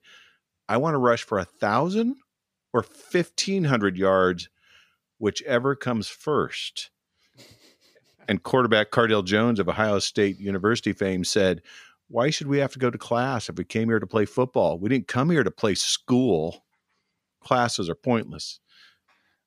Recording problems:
none

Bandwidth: 15 kHz